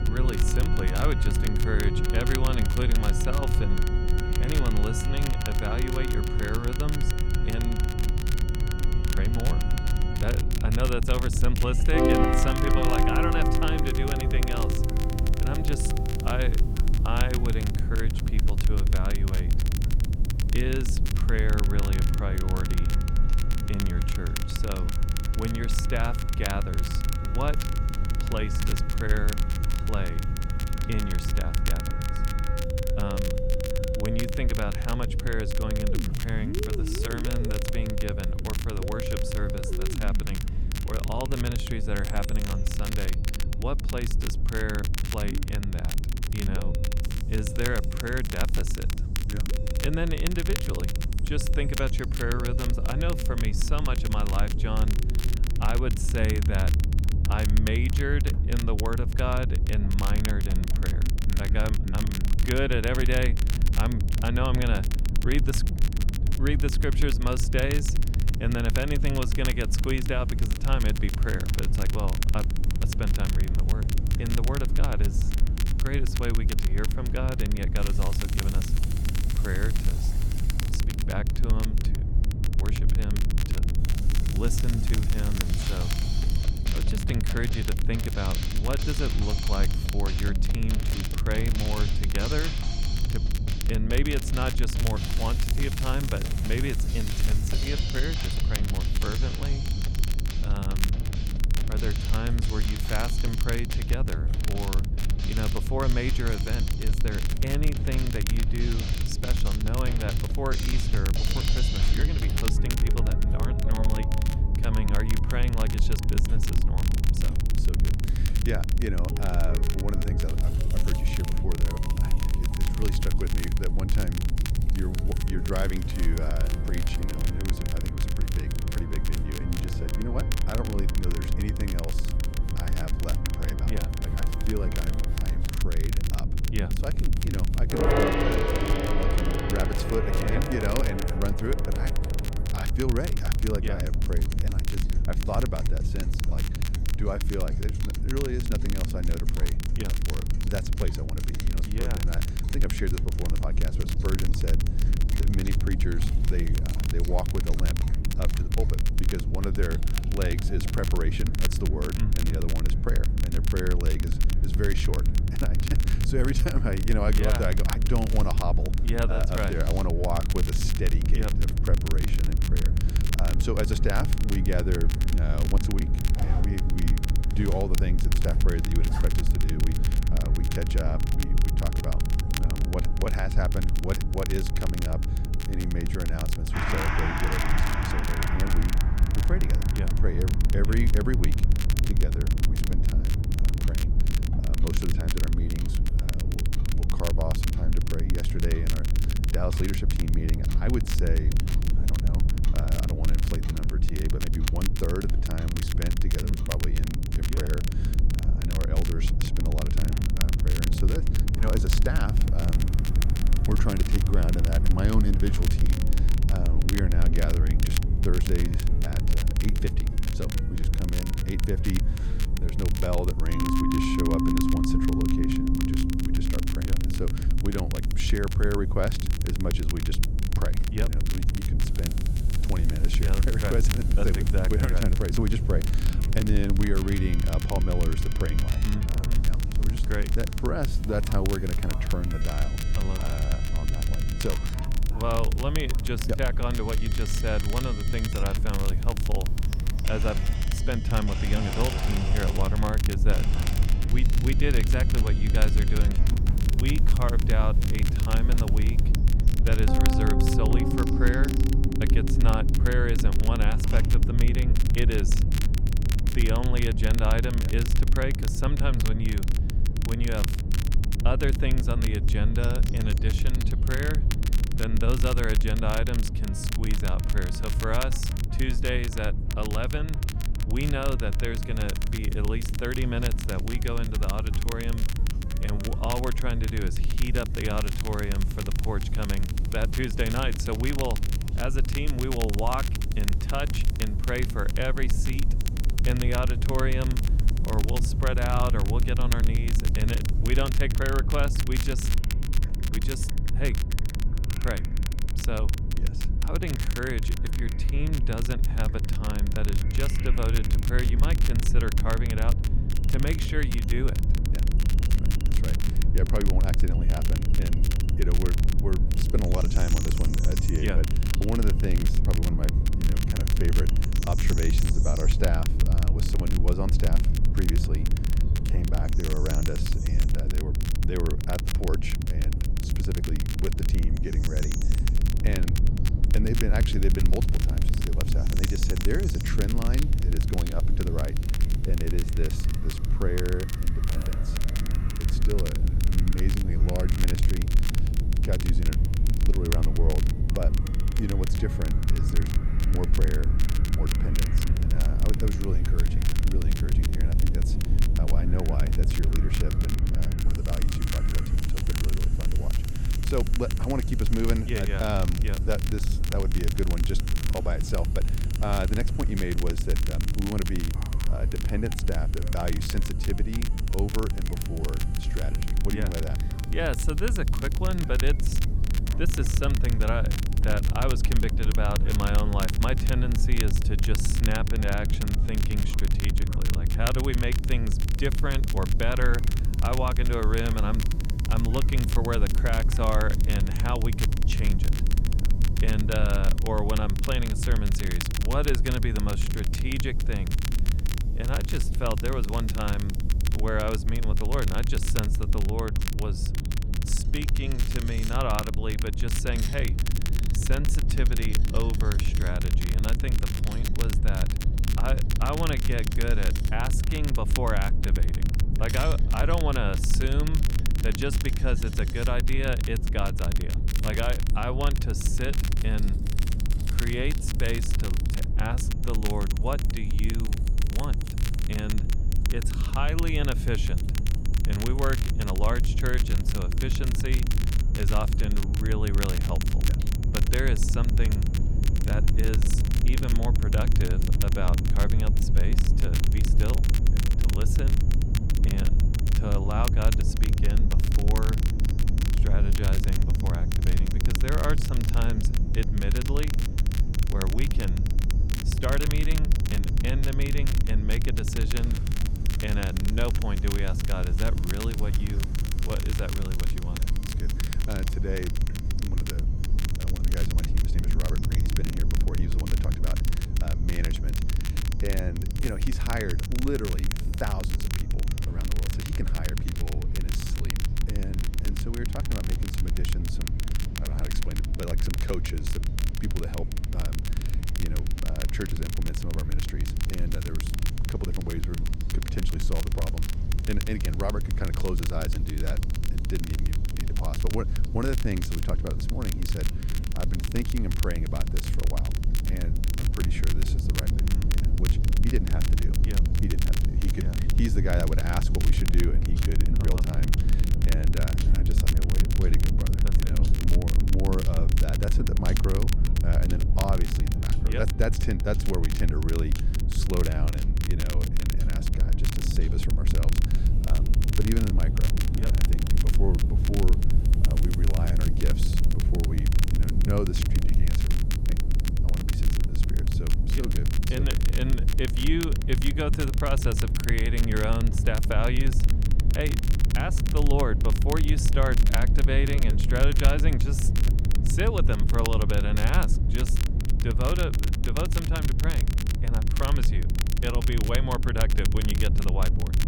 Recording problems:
background music; loud; throughout; 3 dB below the speech
low rumble; loud; throughout; 8 dB below the speech
crackle, like an old record; loud; 7 dB below the speech
animal sounds; faint; throughout; 25 dB below the speech
household noises; faint; throughout; 20 dB below the speech

